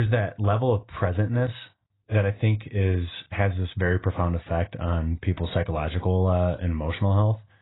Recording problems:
garbled, watery; badly; nothing above 4 kHz
abrupt cut into speech; at the start

